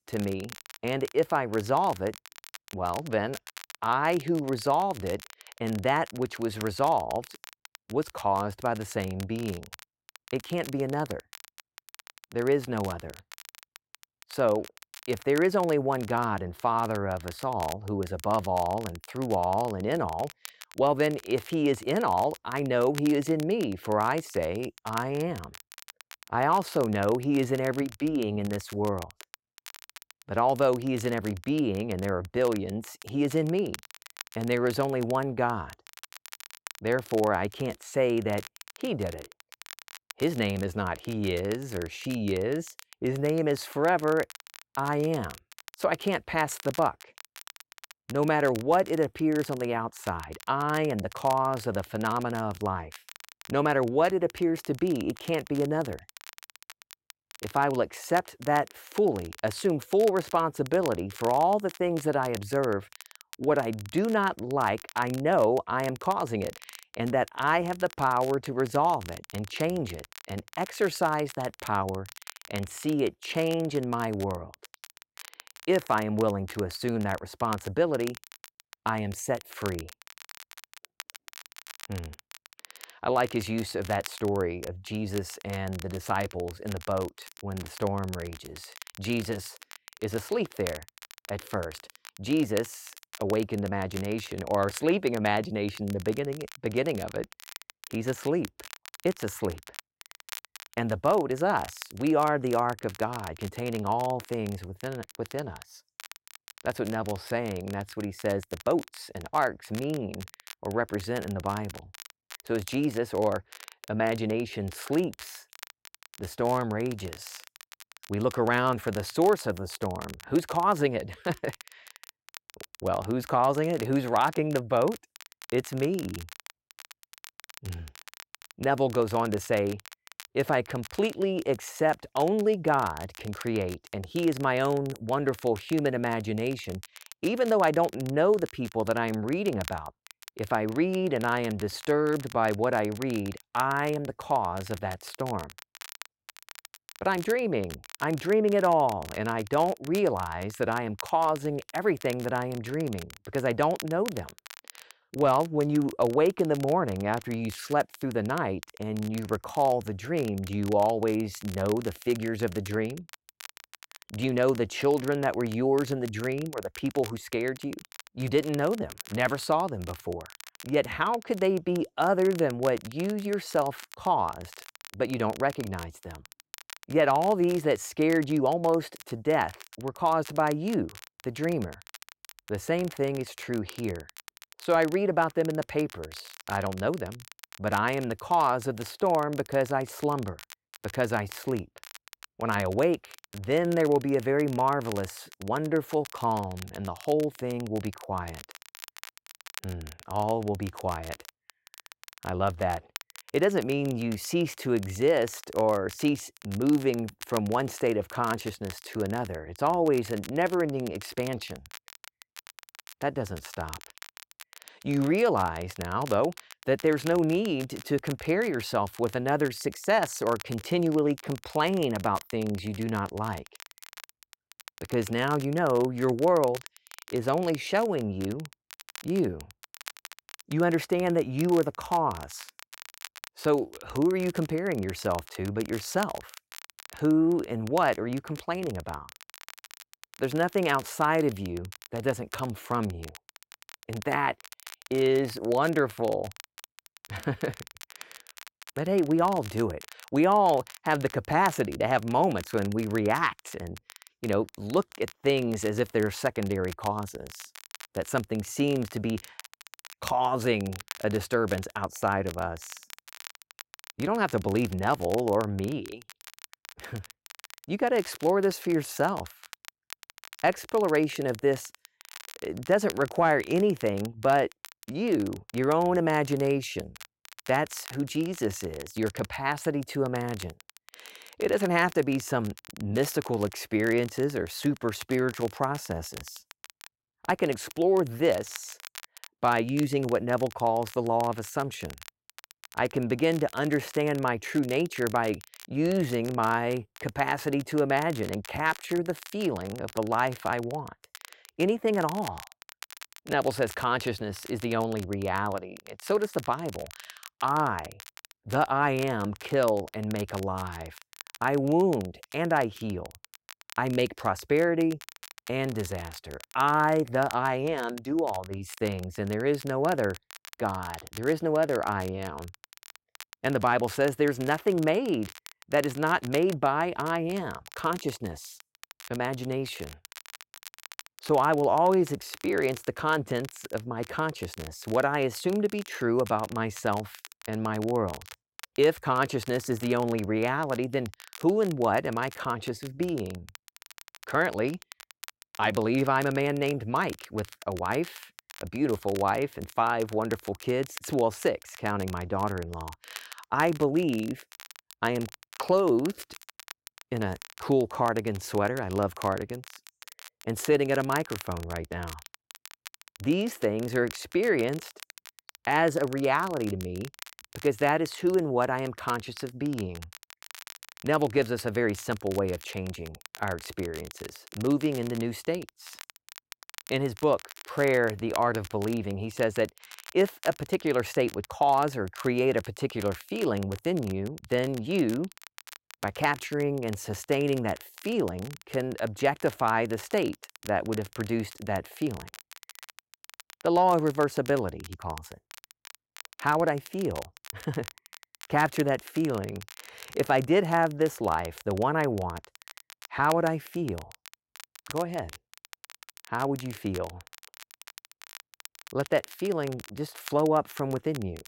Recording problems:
crackle, like an old record; noticeable; 20 dB below the speech

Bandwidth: 16 kHz